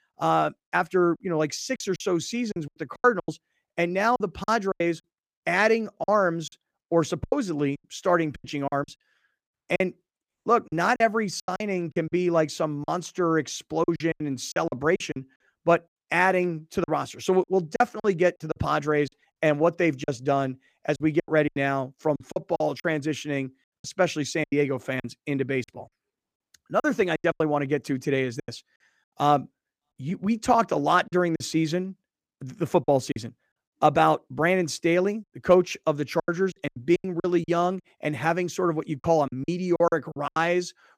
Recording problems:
choppy; very; 11% of the speech affected

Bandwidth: 15 kHz